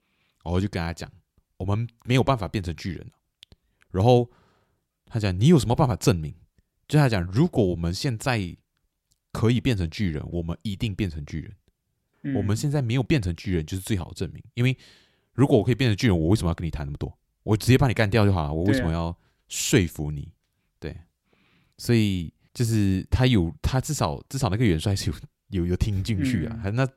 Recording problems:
none

